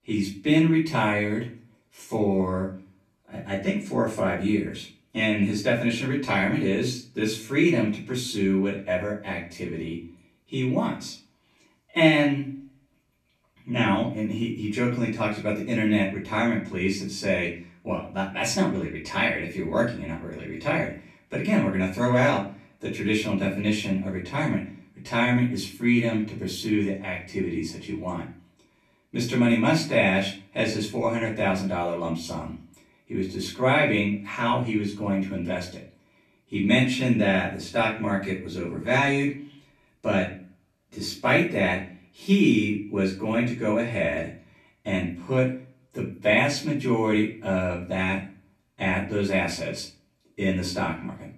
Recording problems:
off-mic speech; far
room echo; slight; dies away in 0.3 s

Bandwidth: 14 kHz